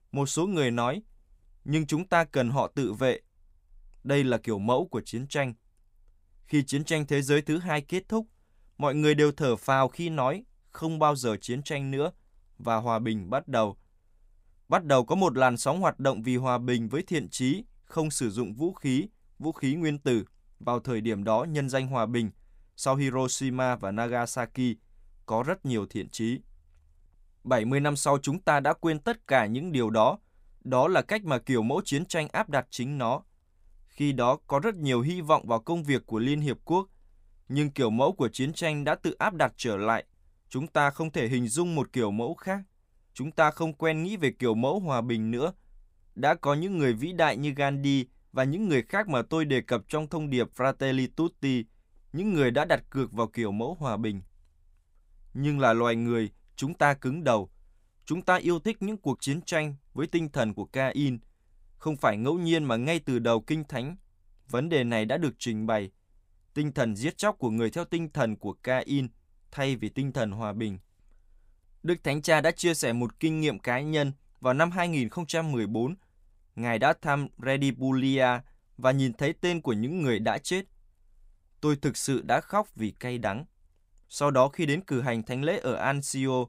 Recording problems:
none

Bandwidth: 15.5 kHz